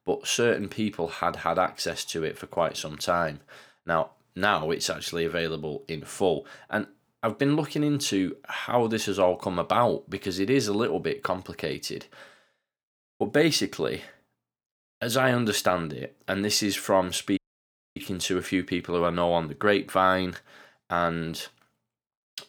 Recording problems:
audio cutting out; at 17 s for 0.5 s

